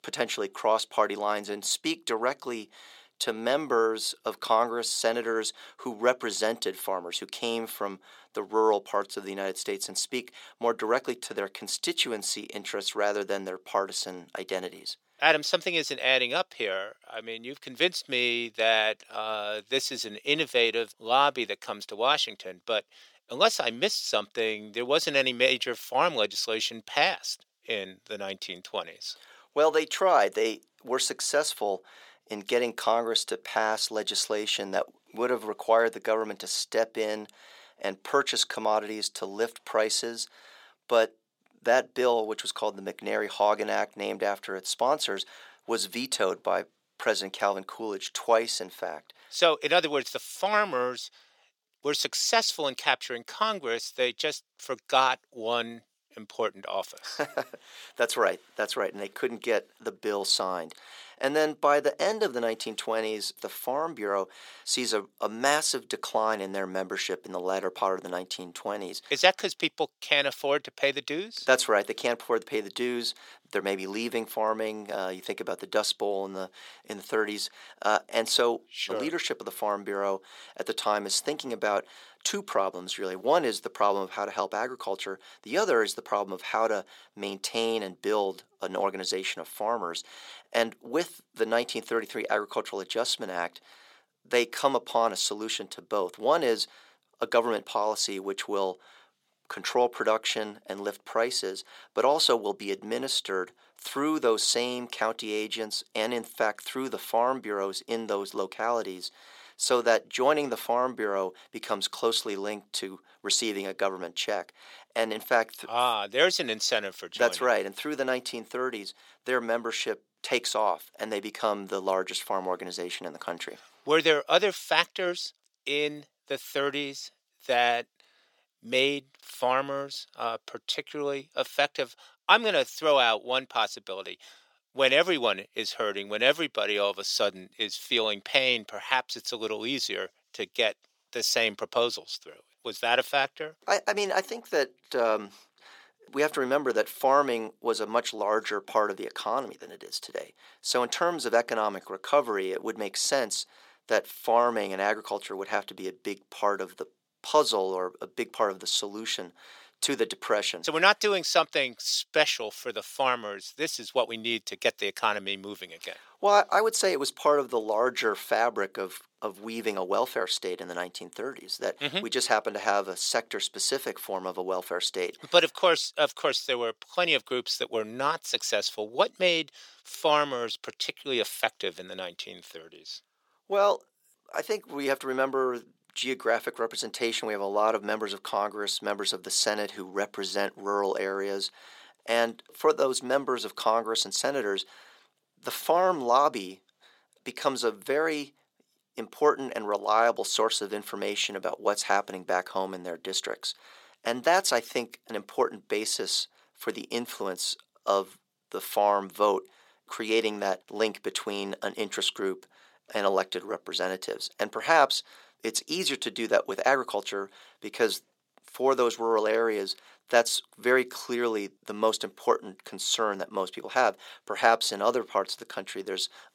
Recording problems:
thin; somewhat; fading below 500 Hz

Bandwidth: 17 kHz